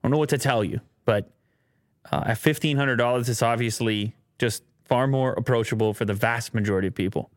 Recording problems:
none

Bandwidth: 16.5 kHz